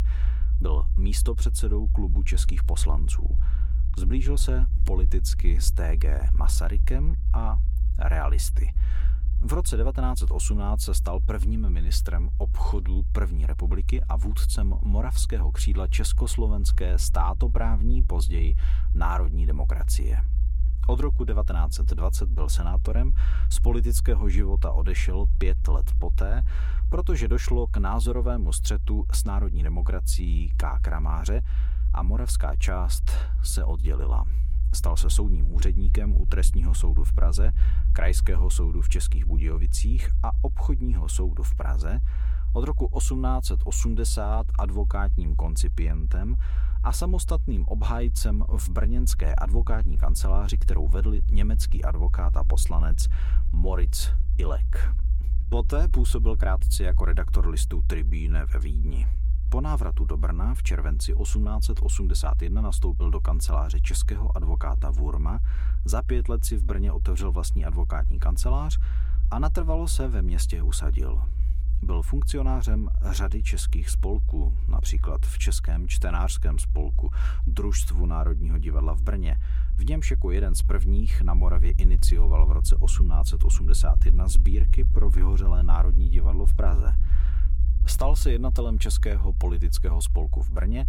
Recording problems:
low rumble; noticeable; throughout; 10 dB below the speech

